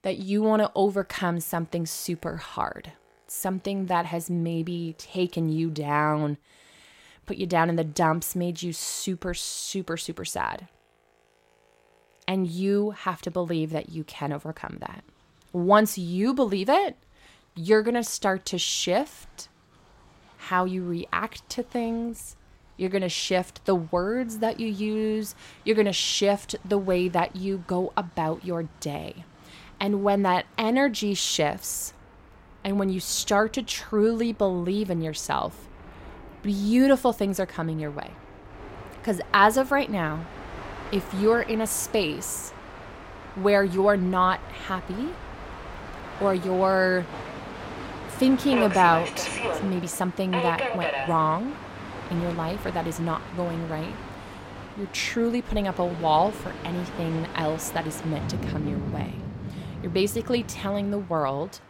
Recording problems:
train or aircraft noise; loud; throughout; 10 dB below the speech

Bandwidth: 16 kHz